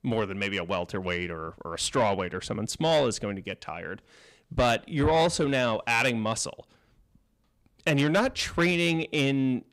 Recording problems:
distortion; slight; 10 dB below the speech

